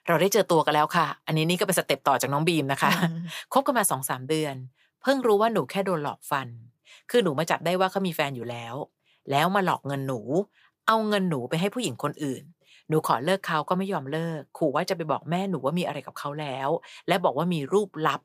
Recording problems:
none

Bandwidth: 15 kHz